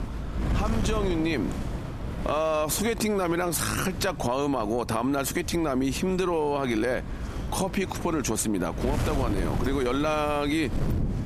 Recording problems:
squashed, flat; somewhat
wind noise on the microphone; occasional gusts; 10 dB below the speech

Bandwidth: 14 kHz